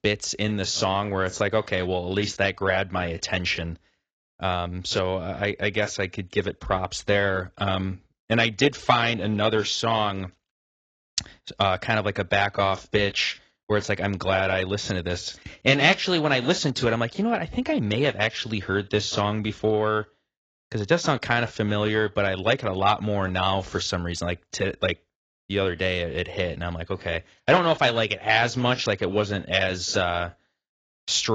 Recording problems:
garbled, watery; badly; nothing above 7.5 kHz
abrupt cut into speech; at the end

